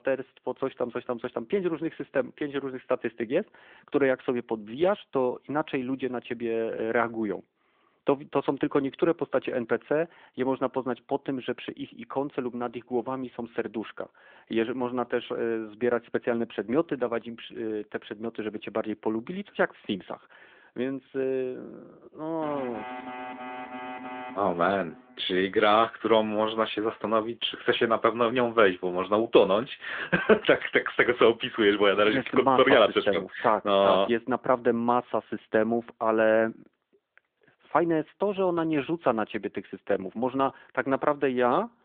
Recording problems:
phone-call audio
alarm; faint; from 22 to 25 s; peak 10 dB below the speech

